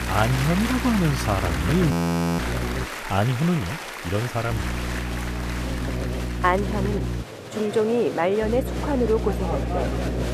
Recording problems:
crowd noise; loud; throughout; 7 dB below the speech
electrical hum; noticeable; until 3 s, from 4.5 to 7 s and from 8.5 s on; 60 Hz, 10 dB below the speech
audio freezing; at 2 s

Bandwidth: 14.5 kHz